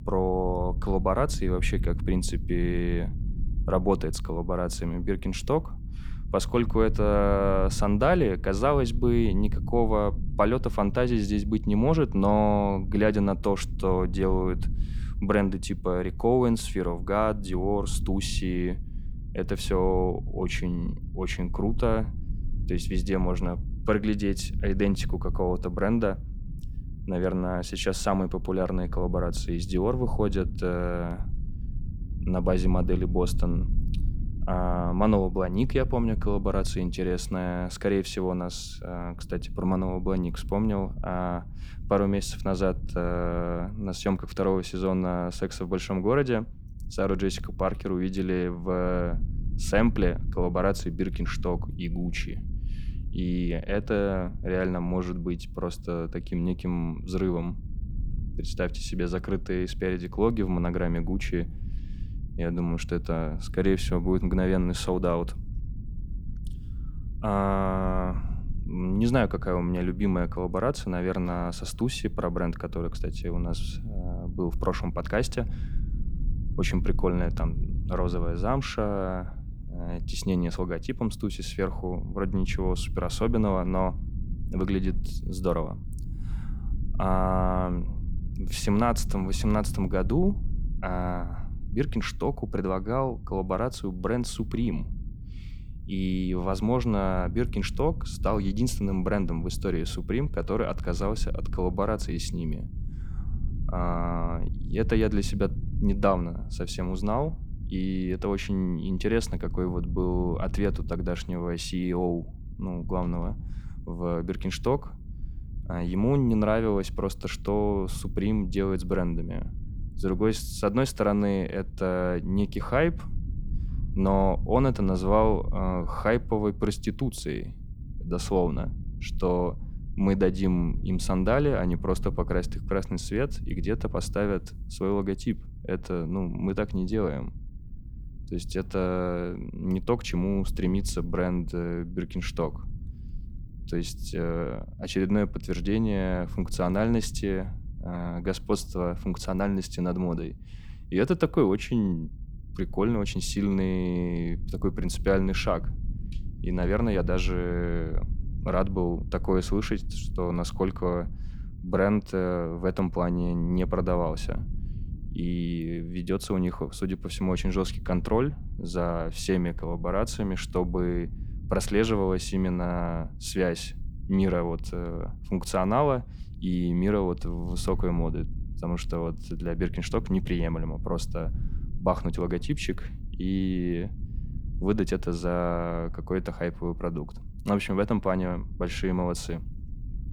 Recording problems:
low rumble; faint; throughout; 20 dB below the speech

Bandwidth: 19 kHz